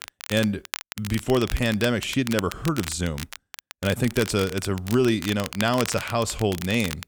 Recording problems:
crackle, like an old record; noticeable; 10 dB below the speech

